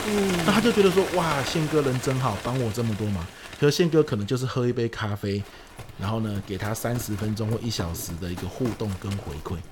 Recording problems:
animal sounds; loud; throughout; 9 dB below the speech

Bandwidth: 17 kHz